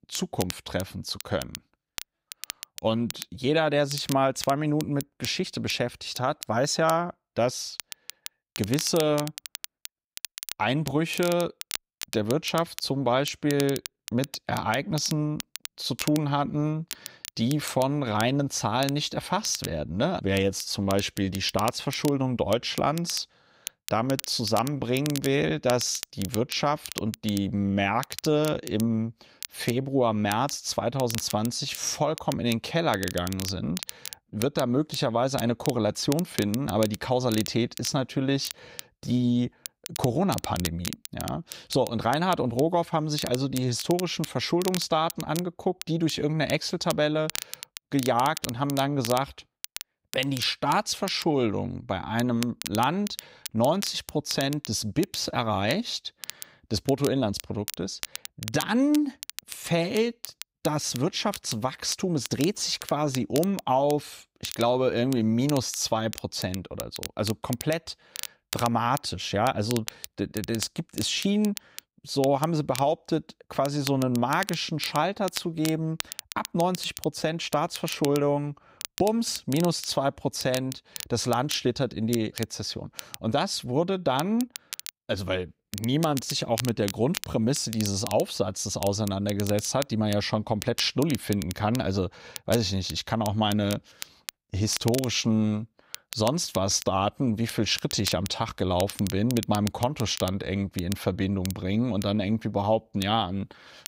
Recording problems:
crackle, like an old record; noticeable; 10 dB below the speech

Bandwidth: 15.5 kHz